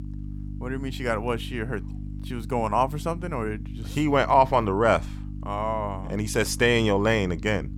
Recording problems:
electrical hum; faint; throughout; 50 Hz, 25 dB below the speech

